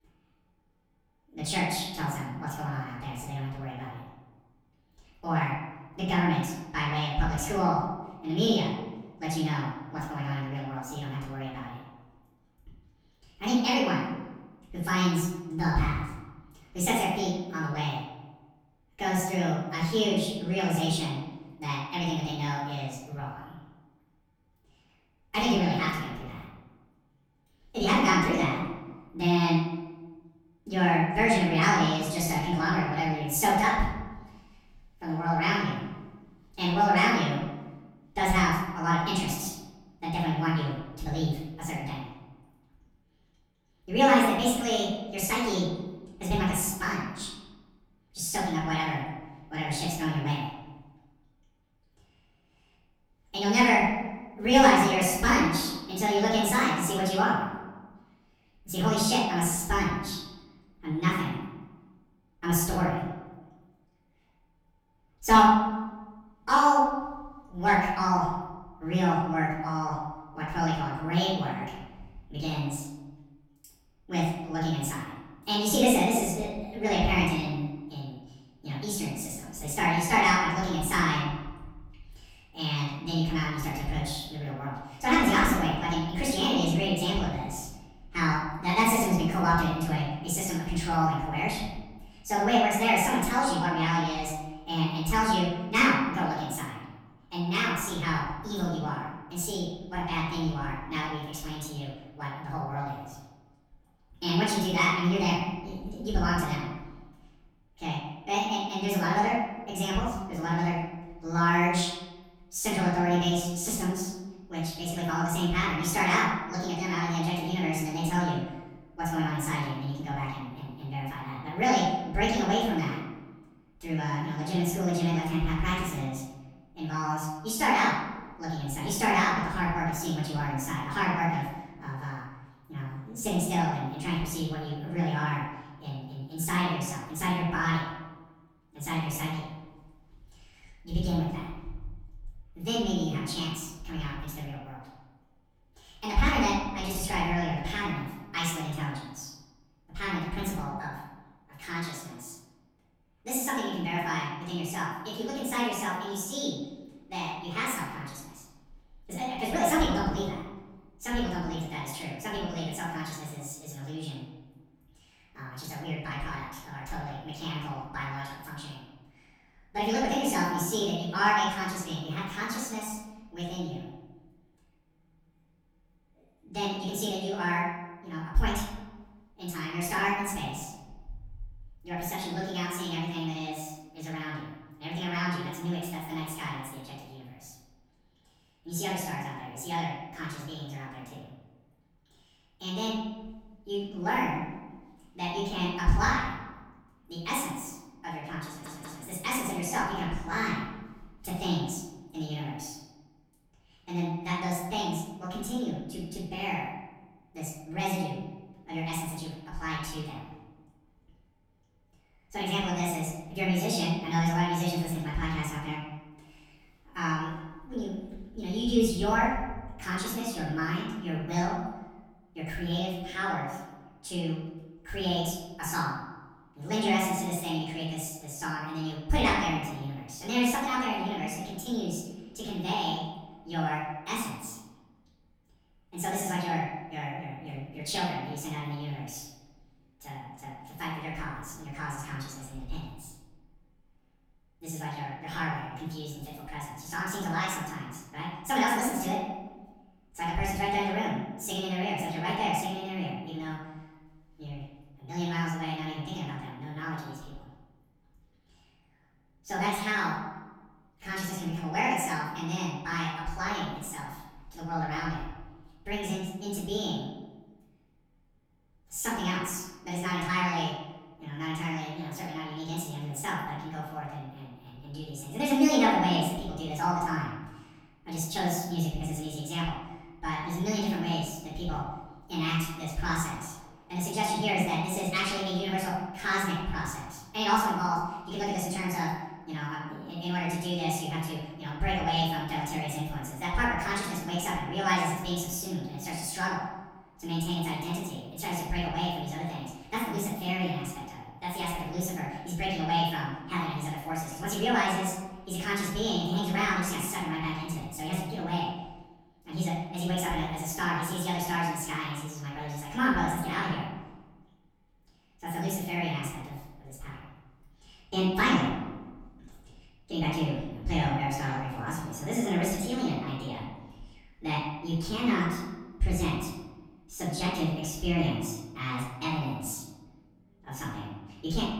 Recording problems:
off-mic speech; far
wrong speed and pitch; too fast and too high; 1.5 times normal speed
room echo; noticeable; dies away in 1 s
audio stuttering; at 3:18

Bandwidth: 19 kHz